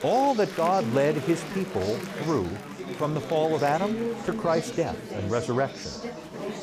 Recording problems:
murmuring crowd; loud; throughout; 7 dB below the speech

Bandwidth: 15 kHz